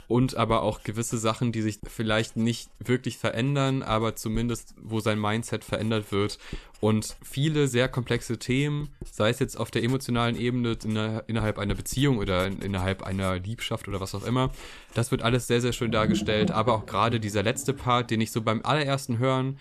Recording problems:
household noises; noticeable; throughout; 10 dB below the speech

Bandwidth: 13.5 kHz